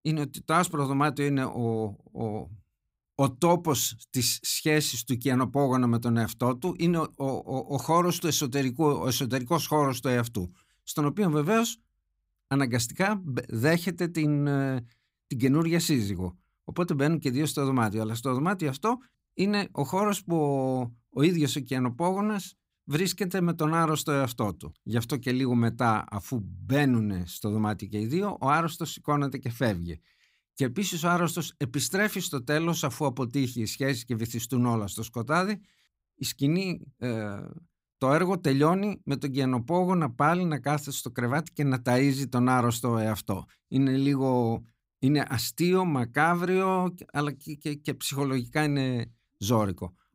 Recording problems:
none

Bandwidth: 15.5 kHz